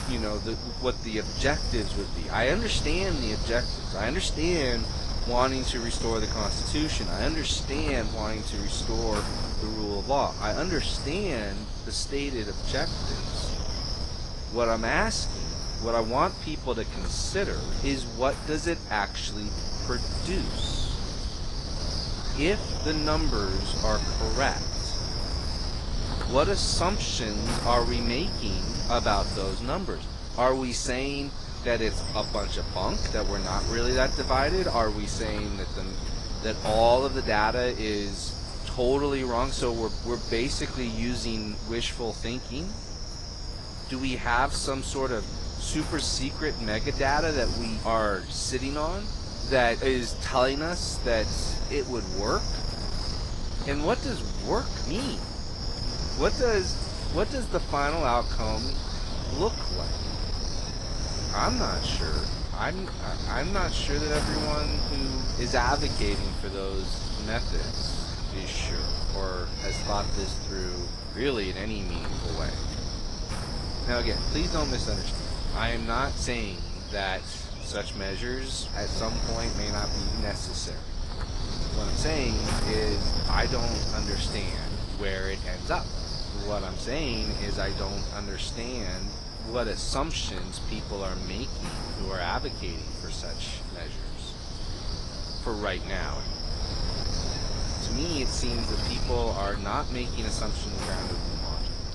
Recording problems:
garbled, watery; slightly
wind noise on the microphone; heavy; 5 dB below the speech
animal sounds; faint; throughout; 25 dB below the speech

